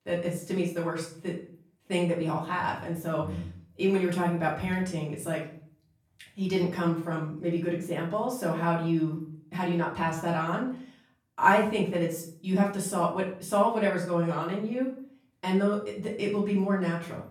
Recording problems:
off-mic speech; far
room echo; slight; dies away in 0.4 s

